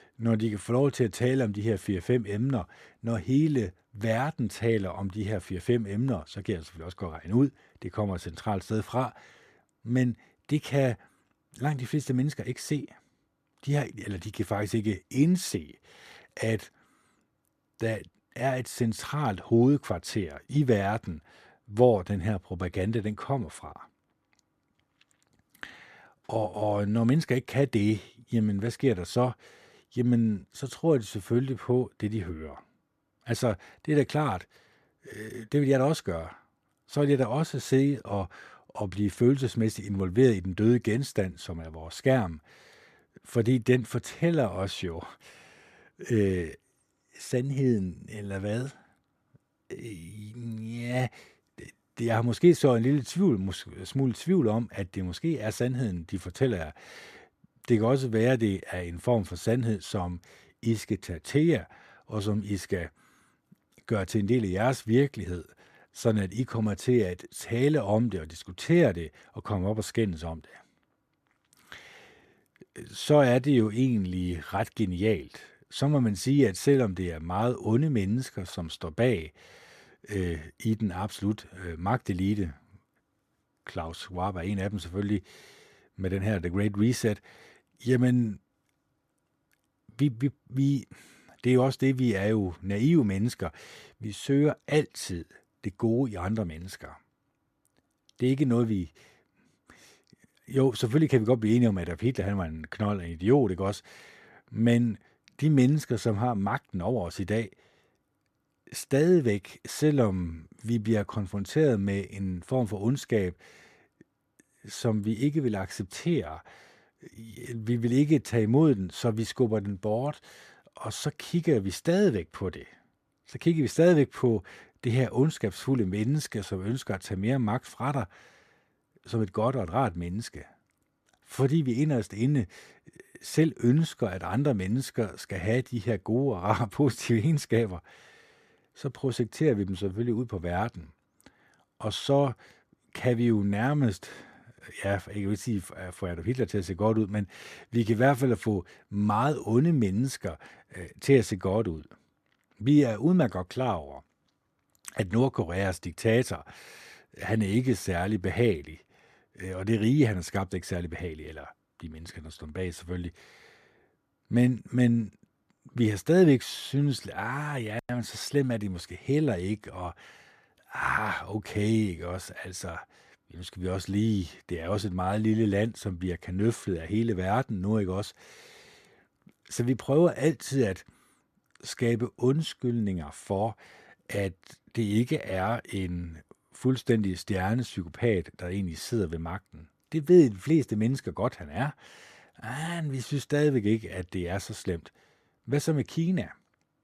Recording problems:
none

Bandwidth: 14.5 kHz